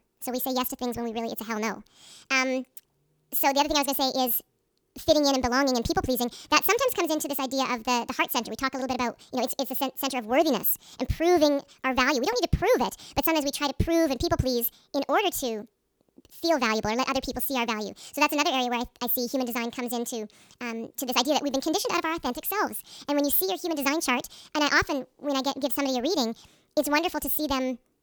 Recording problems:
wrong speed and pitch; too fast and too high; 1.5 times normal speed

